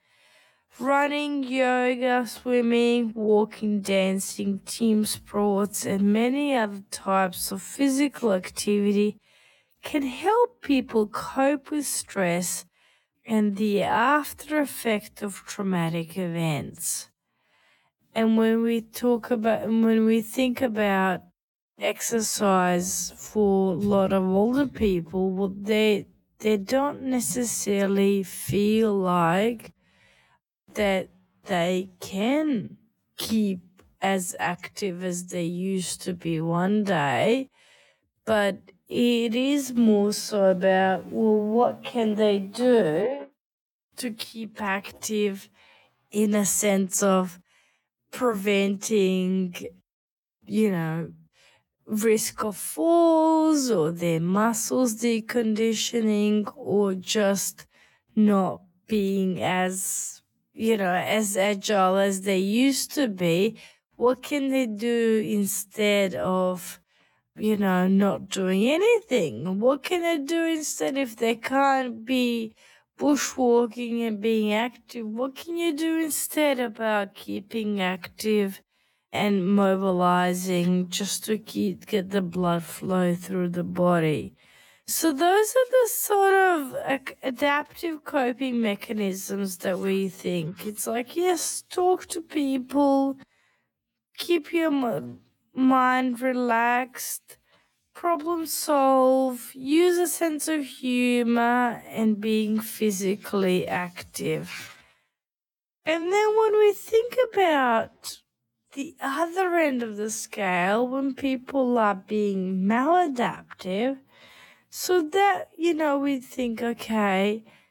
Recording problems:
wrong speed, natural pitch; too slow; 0.6 times normal speed

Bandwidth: 17.5 kHz